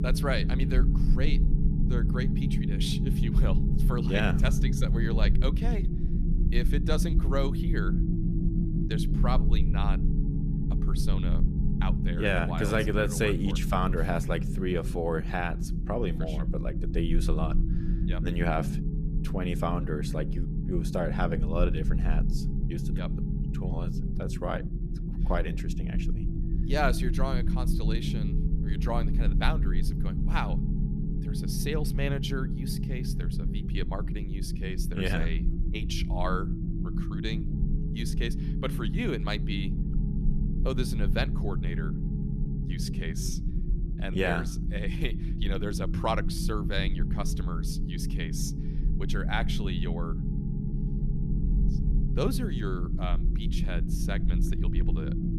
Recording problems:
low rumble; loud; throughout; 6 dB below the speech

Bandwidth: 14 kHz